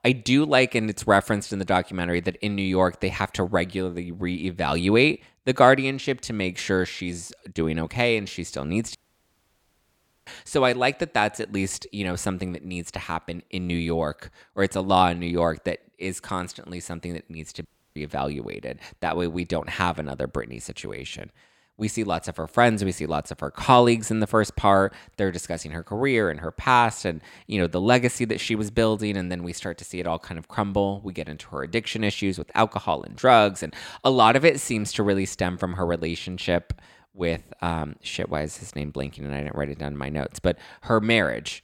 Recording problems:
audio cutting out; at 9 s for 1.5 s and at 18 s

